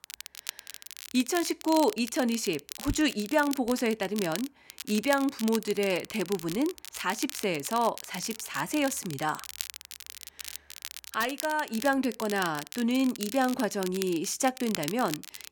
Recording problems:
crackle, like an old record; noticeable; 10 dB below the speech

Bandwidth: 17.5 kHz